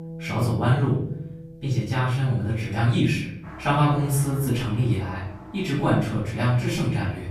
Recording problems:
off-mic speech; far
room echo; noticeable; dies away in 0.6 s
background music; noticeable; throughout; 15 dB below the speech

